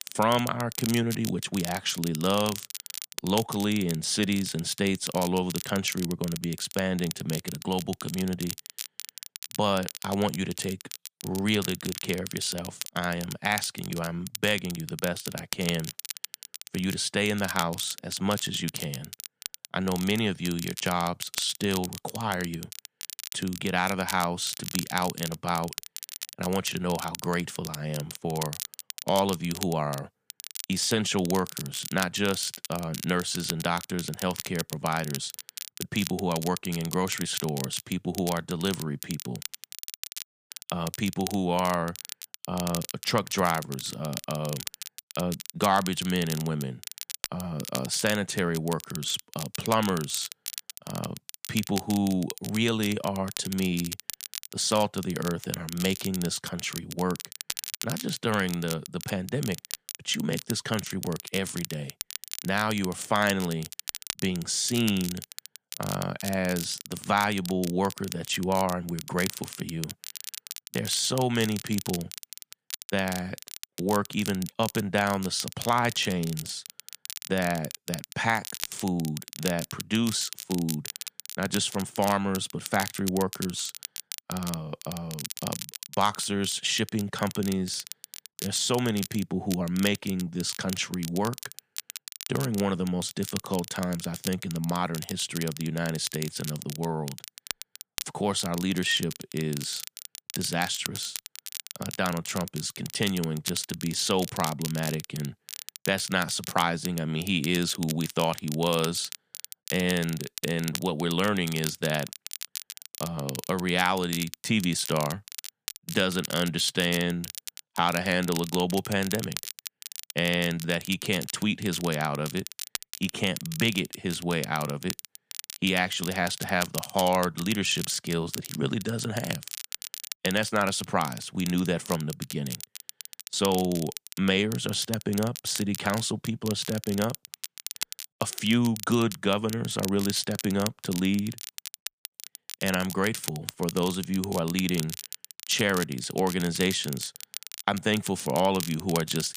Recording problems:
crackle, like an old record; loud; 9 dB below the speech

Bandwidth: 15 kHz